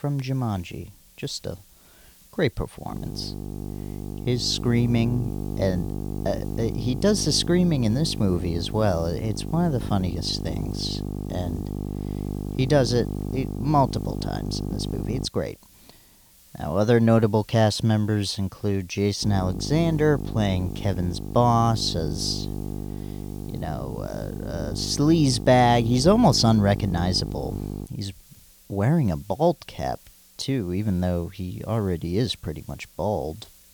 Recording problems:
electrical hum; noticeable; from 3 to 15 s and from 19 to 28 s; 50 Hz, 15 dB below the speech
hiss; faint; throughout; 25 dB below the speech

